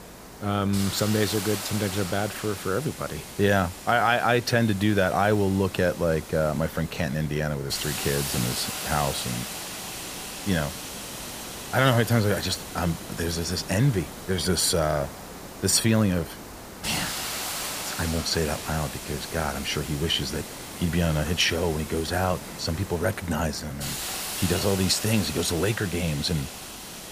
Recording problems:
hiss; loud; throughout; 8 dB below the speech

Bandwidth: 15 kHz